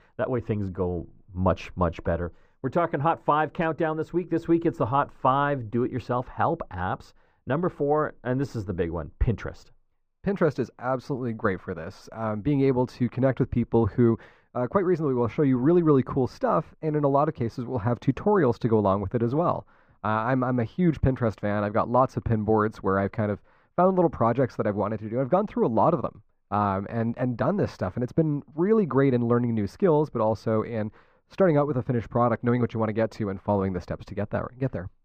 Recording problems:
muffled; very; fading above 2.5 kHz

